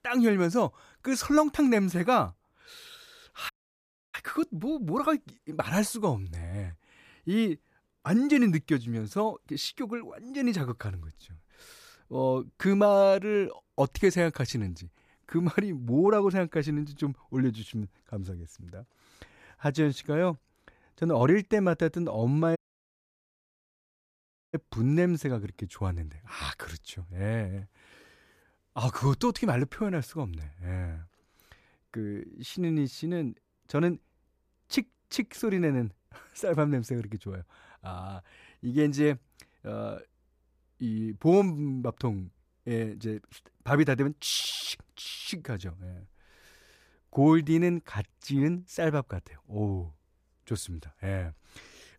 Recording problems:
audio cutting out; at 3.5 s for 0.5 s and at 23 s for 2 s

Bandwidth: 14.5 kHz